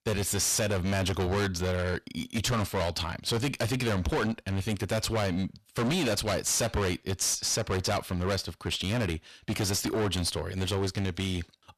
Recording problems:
distortion; heavy; 25% of the sound clipped

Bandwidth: 13.5 kHz